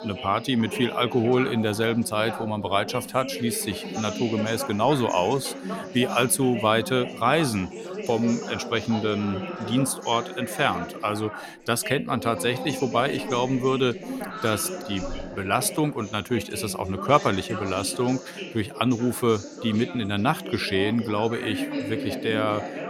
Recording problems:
background chatter; loud; throughout; 4 voices, 9 dB below the speech

